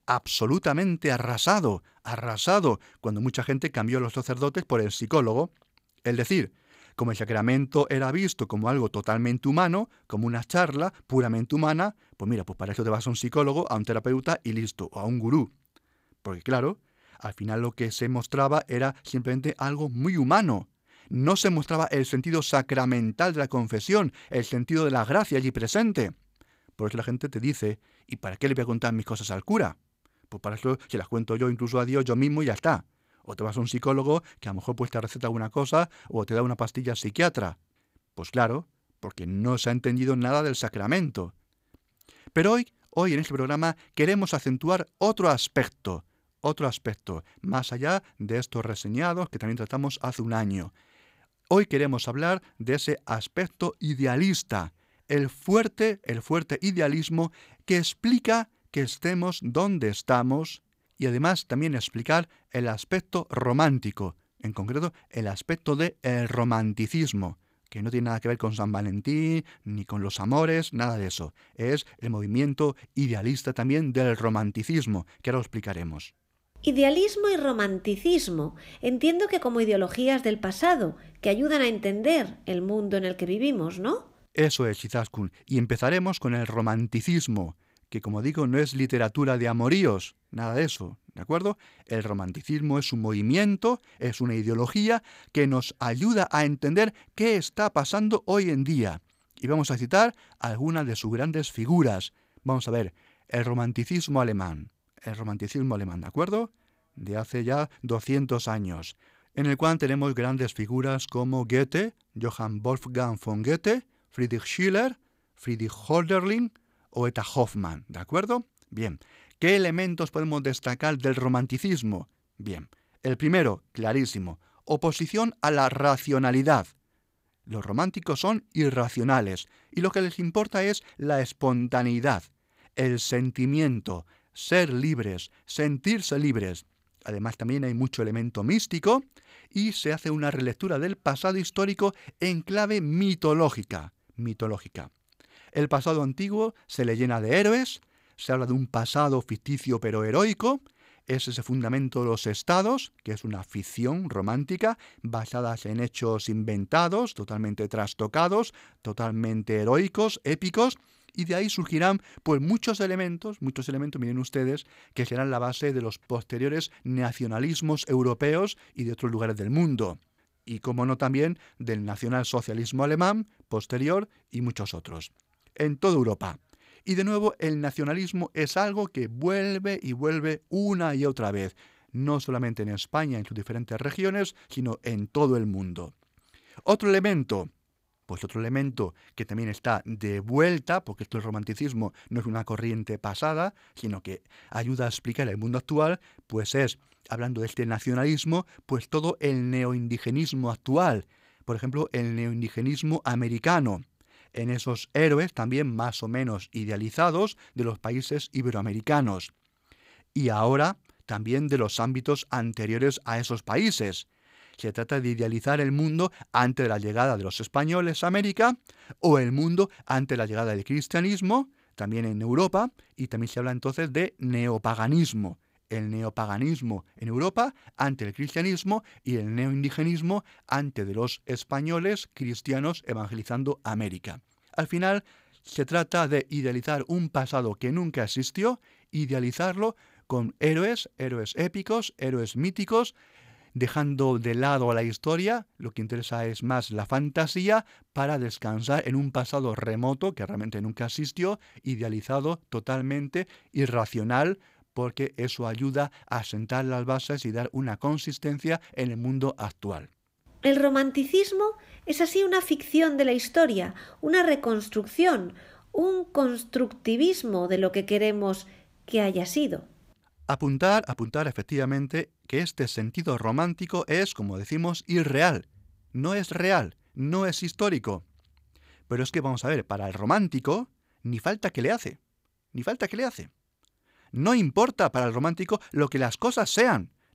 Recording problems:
none

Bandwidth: 15.5 kHz